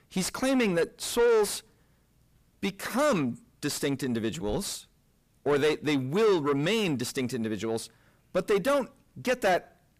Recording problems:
distortion; heavy; 6 dB below the speech

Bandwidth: 15 kHz